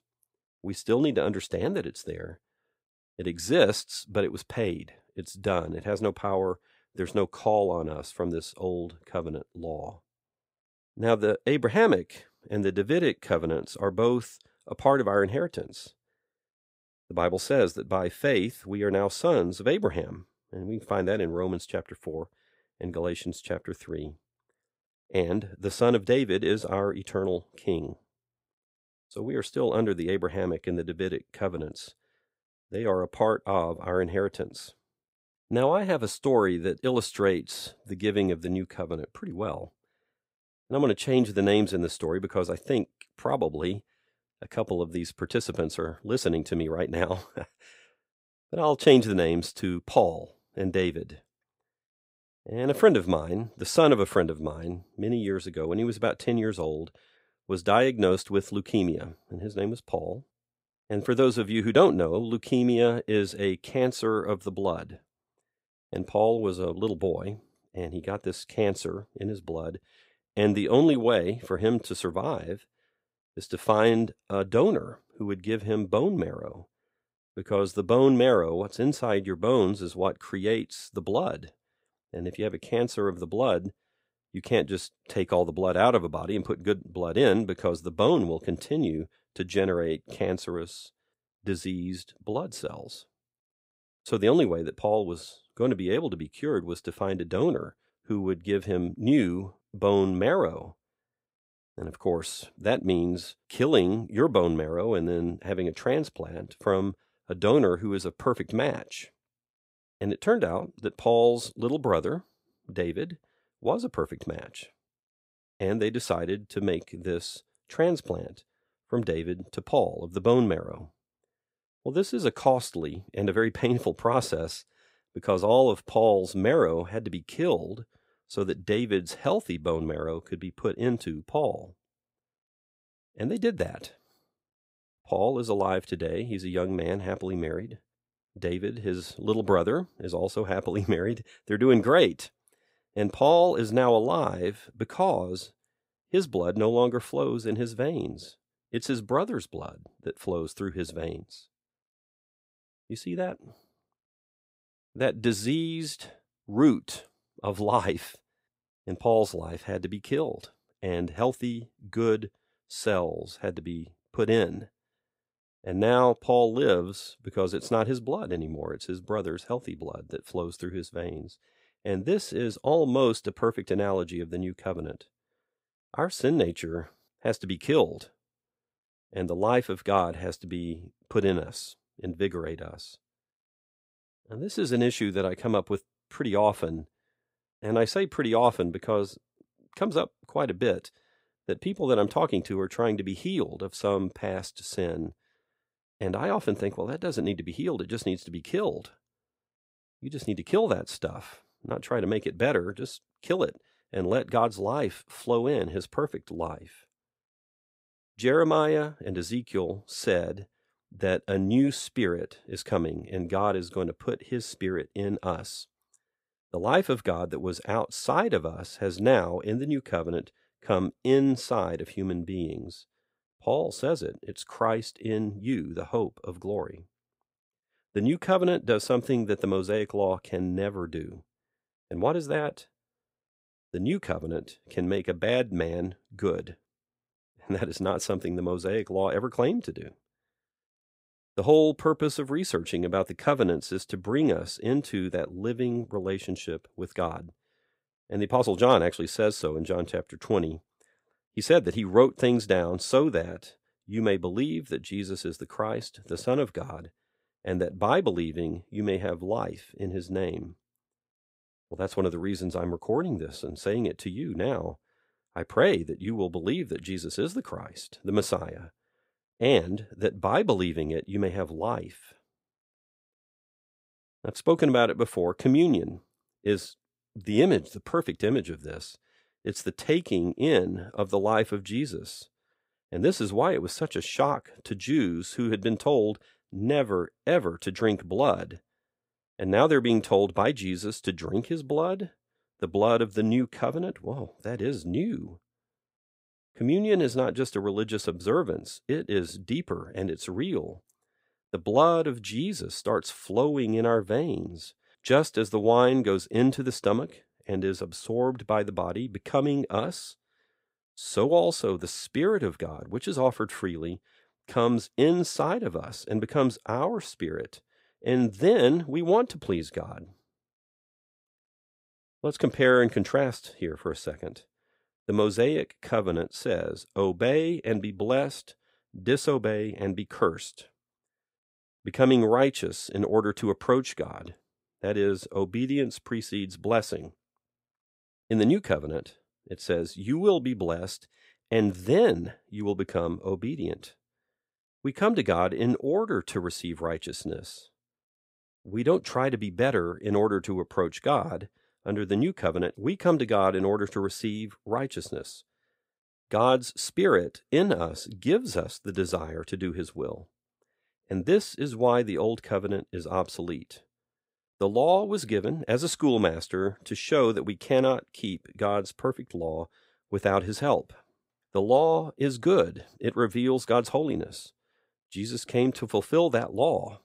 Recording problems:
none

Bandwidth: 15.5 kHz